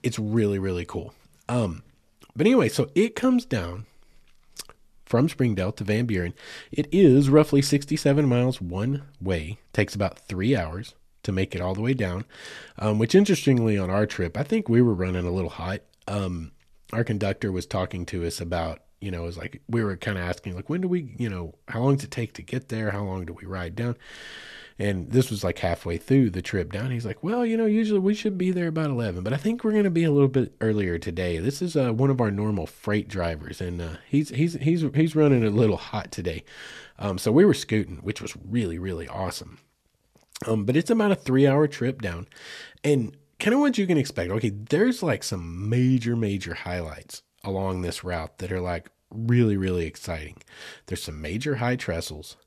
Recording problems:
none

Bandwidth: 13.5 kHz